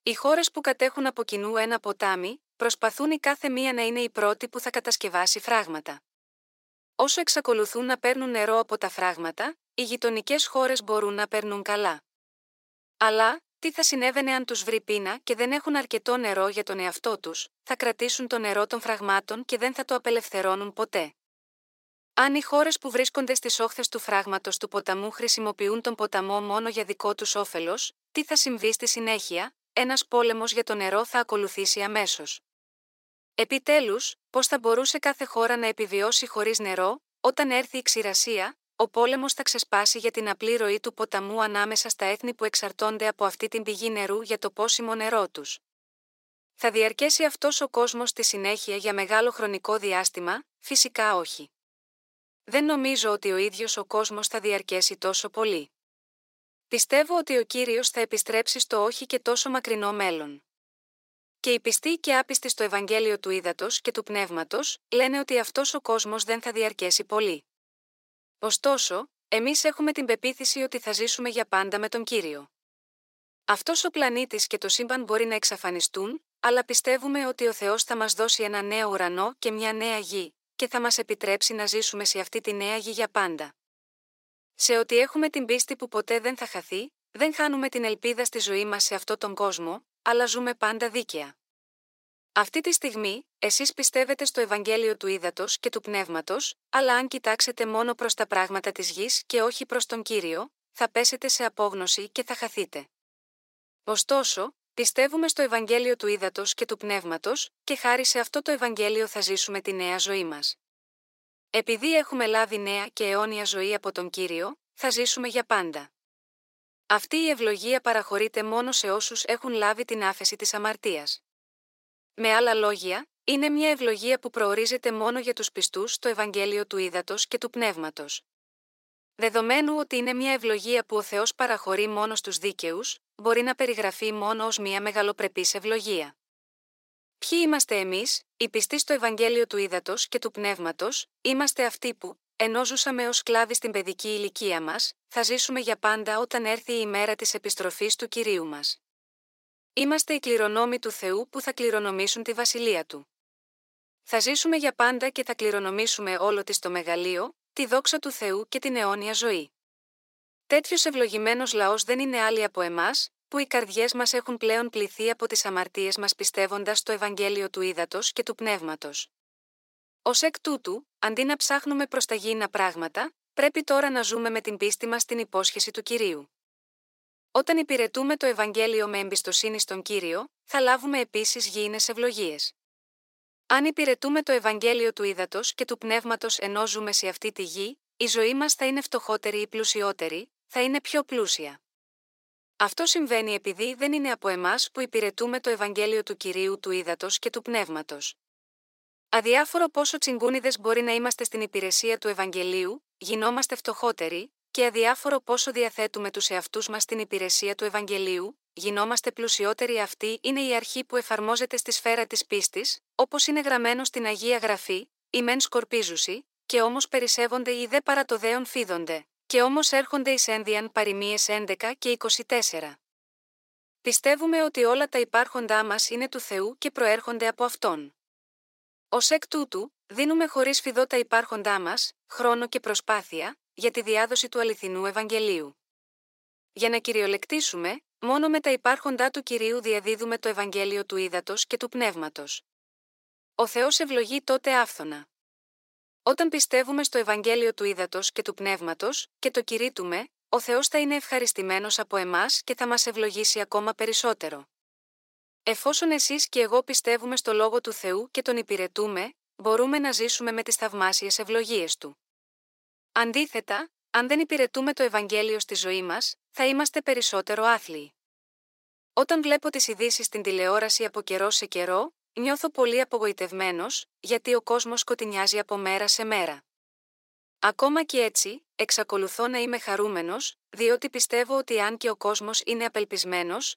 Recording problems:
thin; somewhat; fading below 400 Hz

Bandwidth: 16 kHz